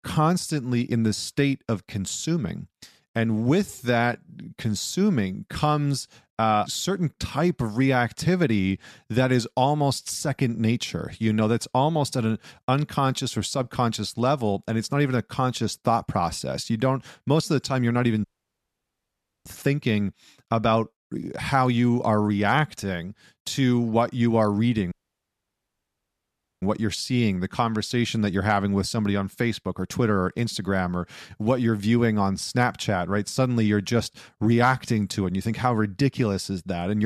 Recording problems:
audio cutting out; at 18 s for 1 s and at 25 s for 1.5 s
abrupt cut into speech; at the end

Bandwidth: 13.5 kHz